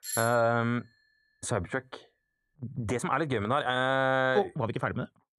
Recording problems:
doorbell; noticeable; at the start; peak 5 dB below the speech
uneven, jittery; strongly

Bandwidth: 14.5 kHz